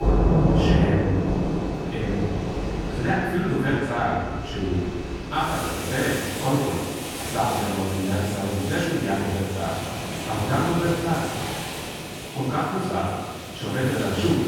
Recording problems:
room echo; strong; dies away in 1.4 s
off-mic speech; far
rain or running water; loud; throughout; 2 dB below the speech
high-pitched whine; faint; throughout; 2.5 kHz, 25 dB below the speech

